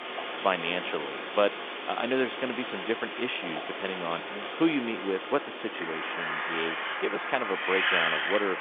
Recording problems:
phone-call audio; nothing above 3.5 kHz
wind in the background; loud; throughout; 1 dB below the speech

